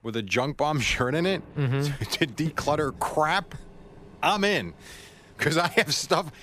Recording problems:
rain or running water; faint; throughout; 25 dB below the speech

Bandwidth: 14.5 kHz